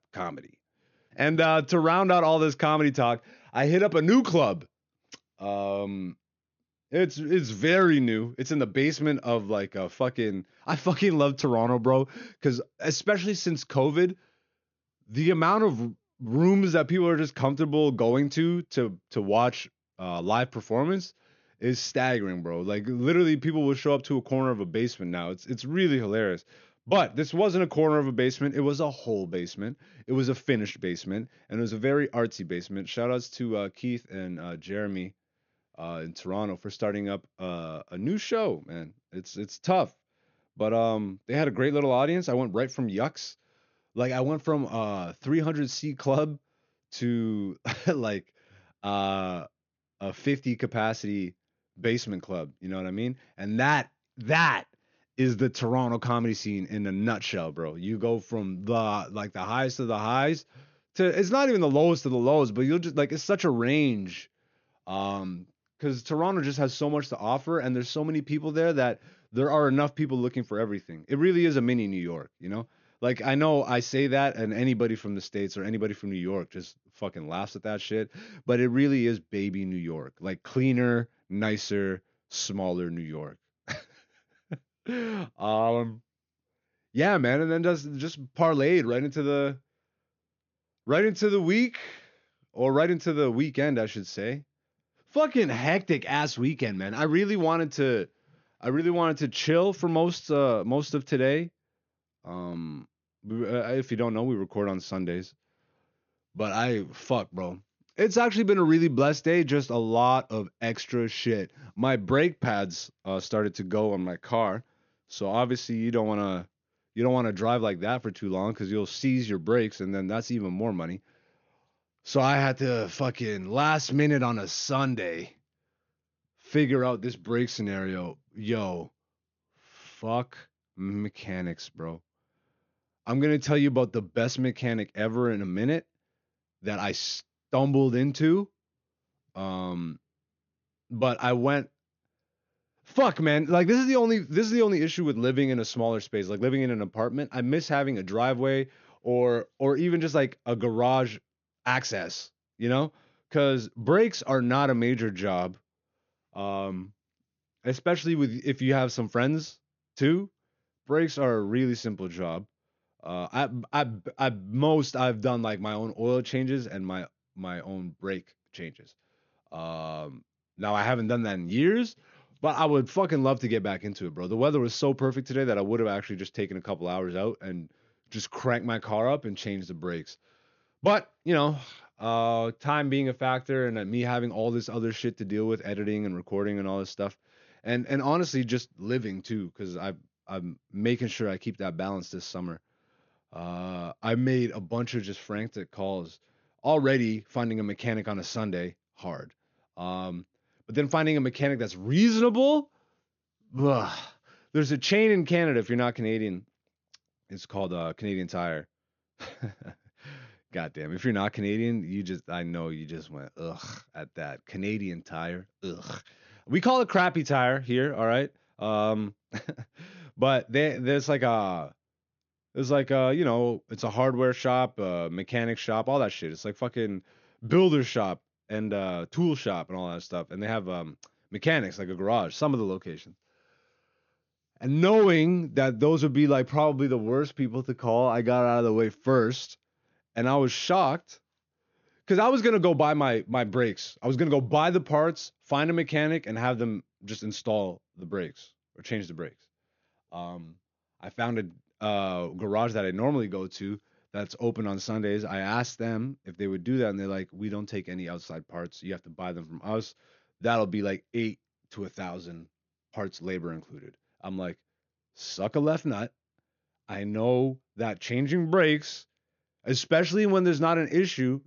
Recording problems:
high frequencies cut off; noticeable; nothing above 6.5 kHz

